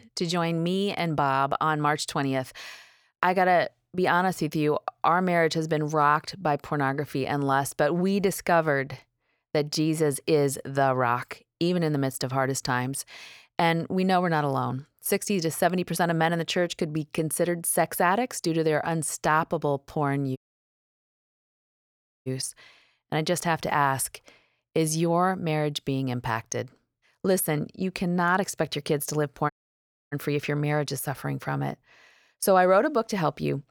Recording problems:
audio cutting out; at 20 s for 2 s and at 30 s for 0.5 s

